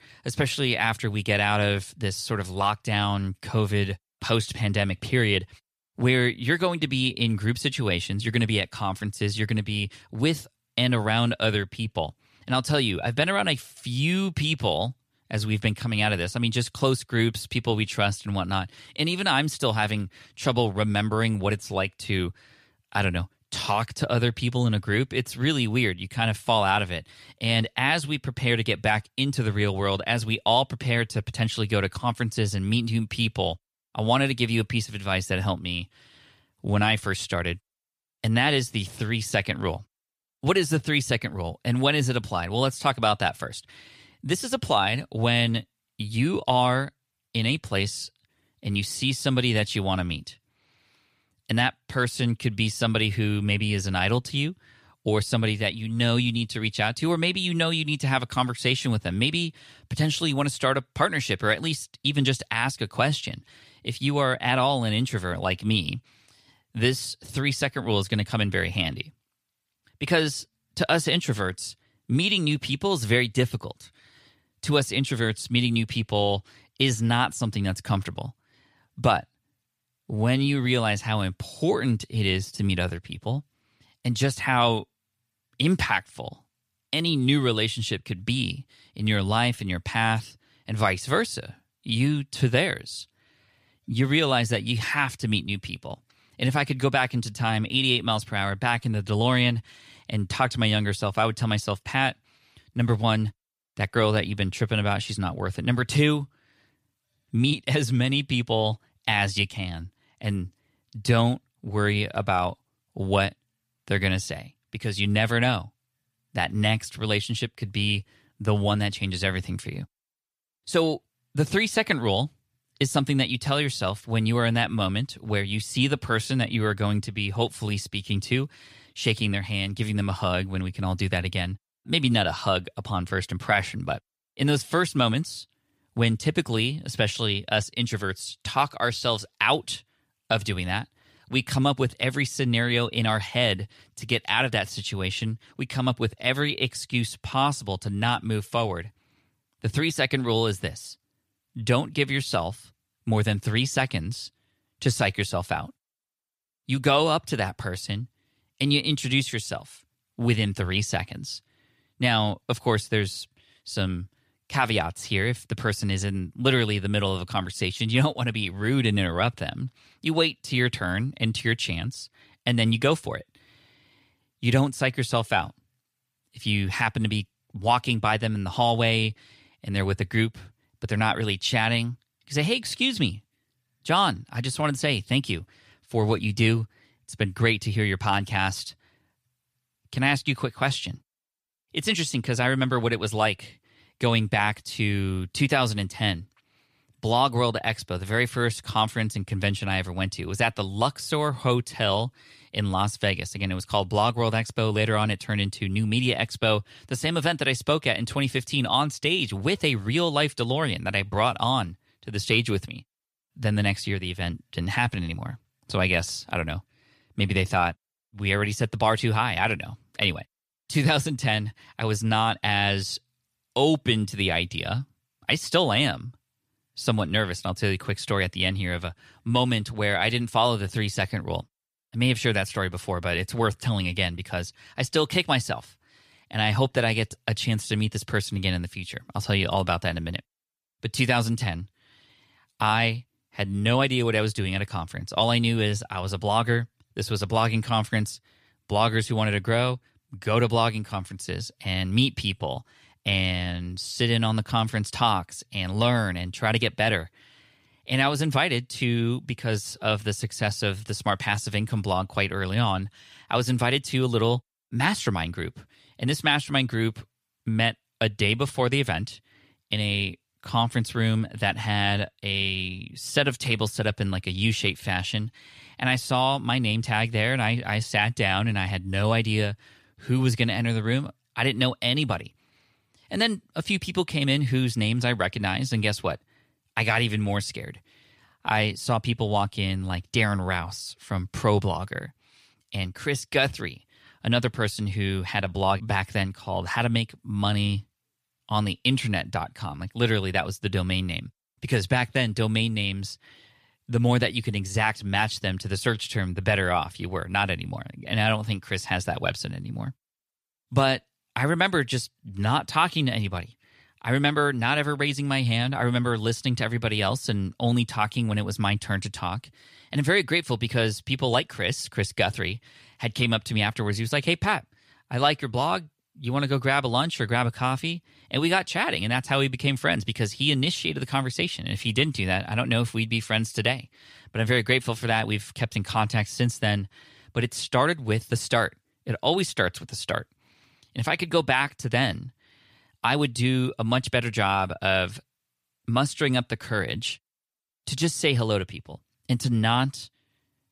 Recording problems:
none

